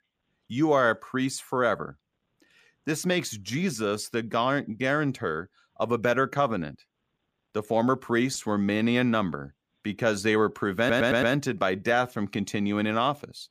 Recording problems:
audio stuttering; at 11 s

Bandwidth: 15 kHz